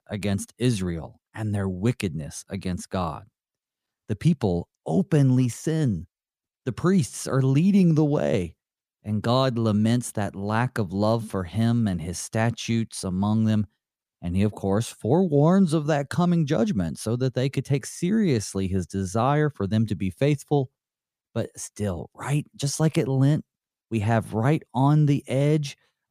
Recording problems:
none

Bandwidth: 15 kHz